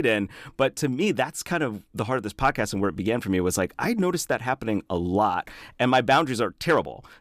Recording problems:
abrupt cut into speech; at the start

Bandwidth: 14.5 kHz